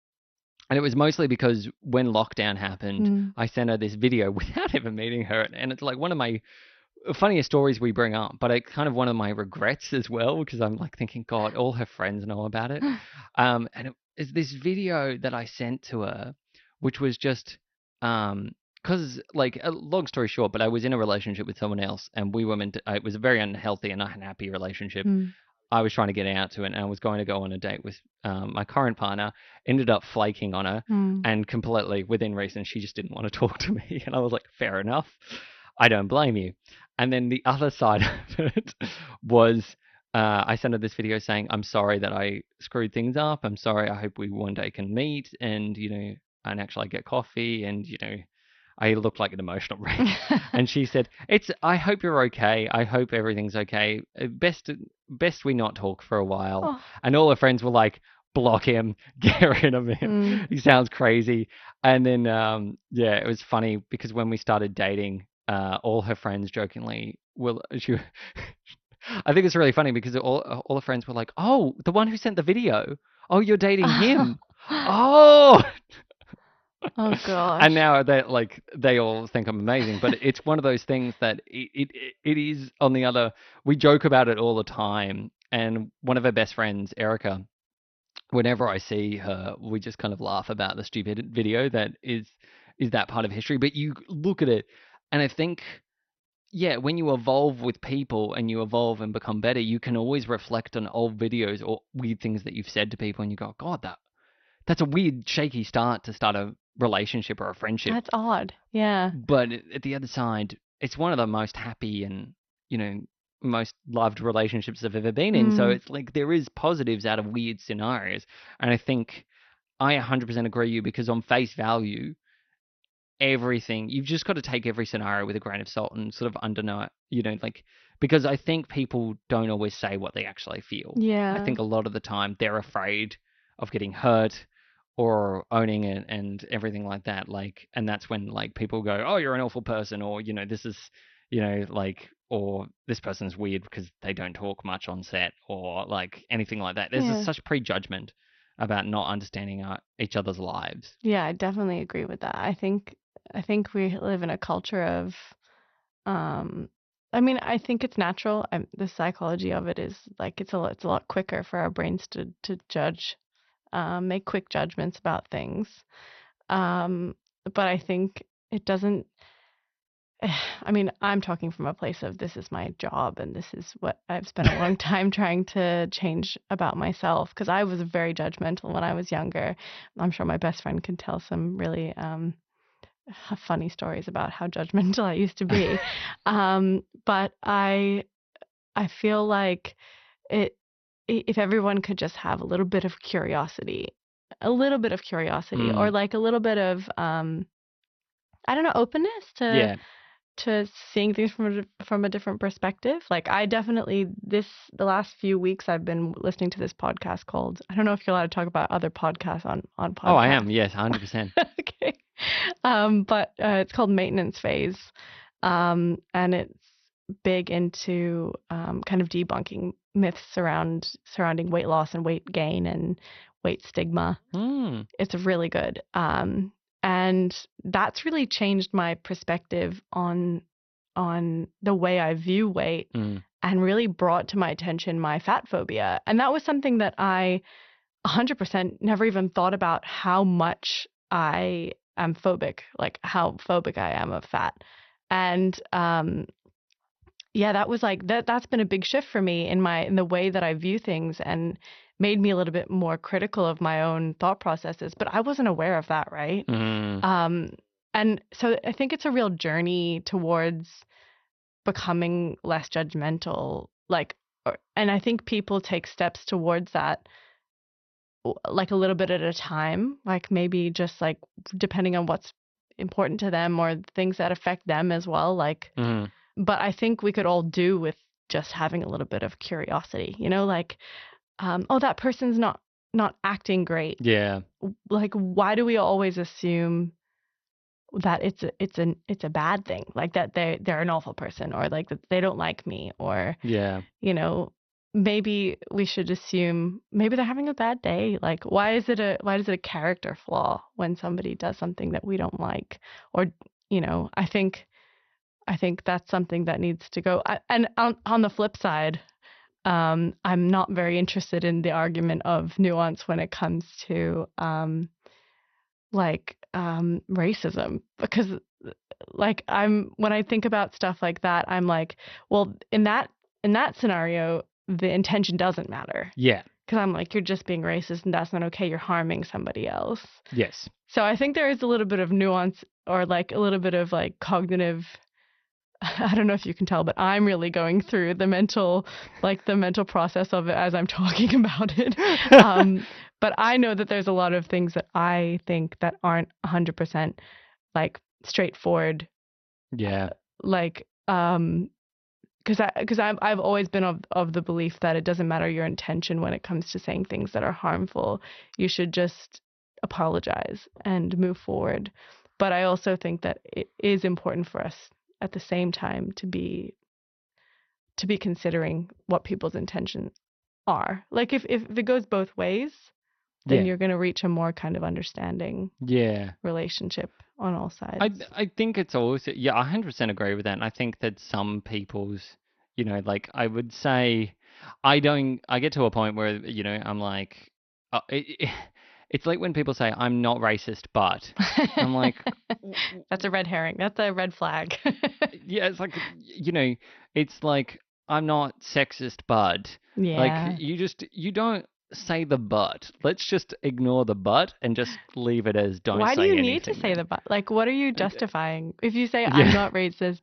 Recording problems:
garbled, watery; slightly; nothing above 6 kHz

